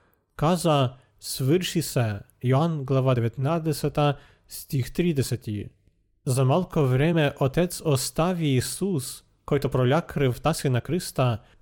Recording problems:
uneven, jittery; strongly; from 1 to 11 s

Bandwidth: 17 kHz